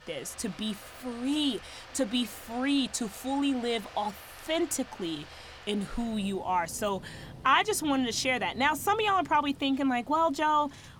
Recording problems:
rain or running water; noticeable; throughout; 20 dB below the speech

